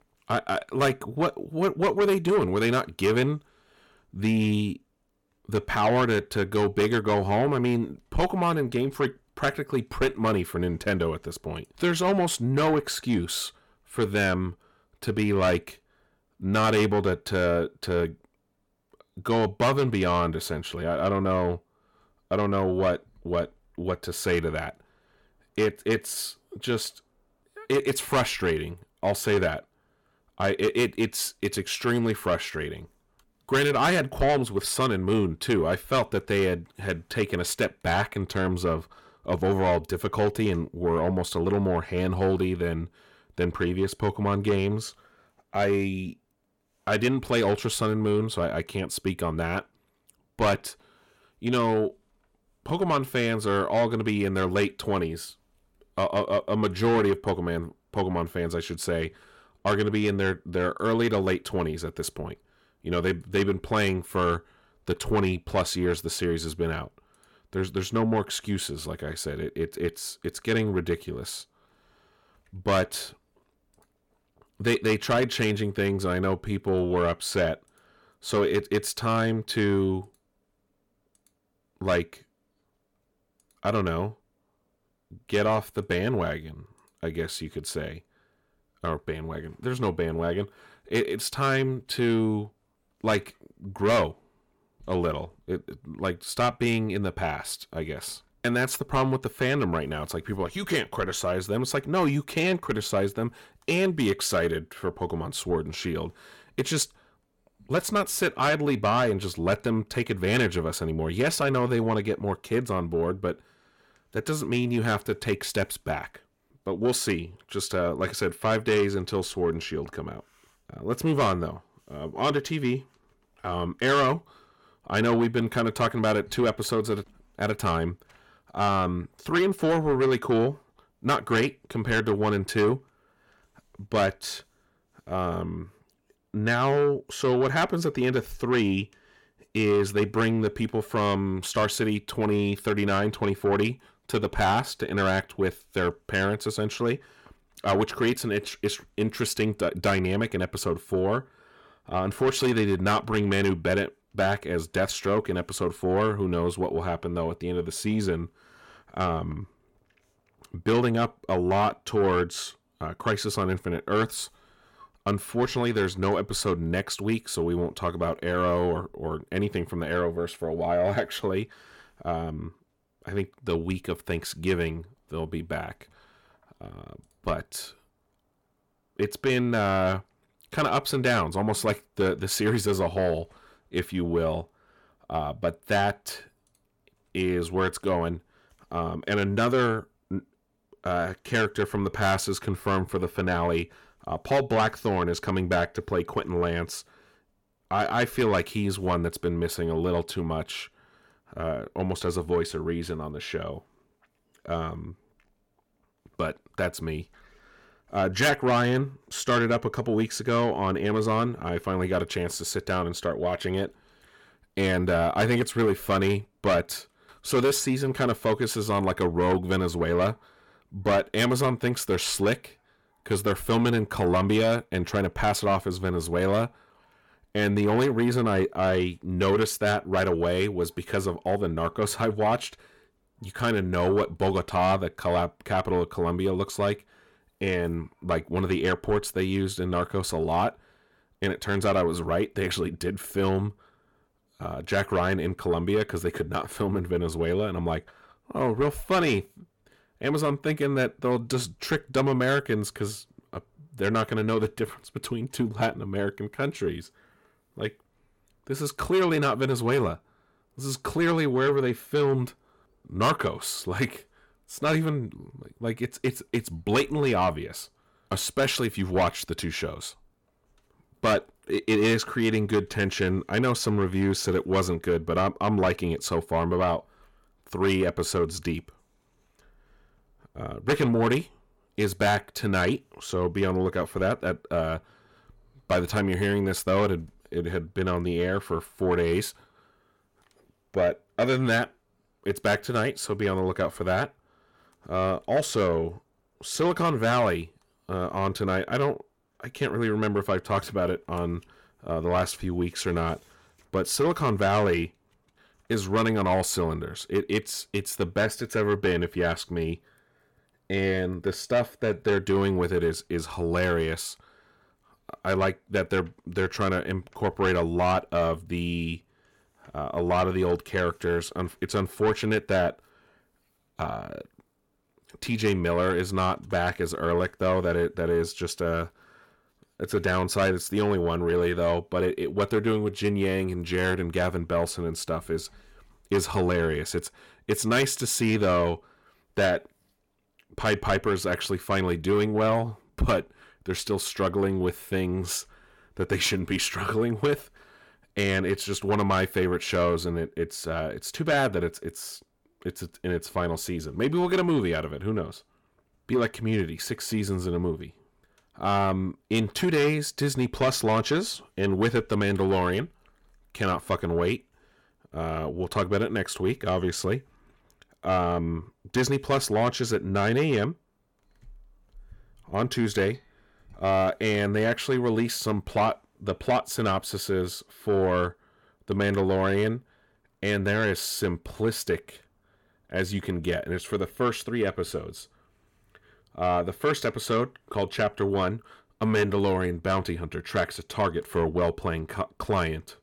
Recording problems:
distortion; slight; 10 dB below the speech

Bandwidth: 17.5 kHz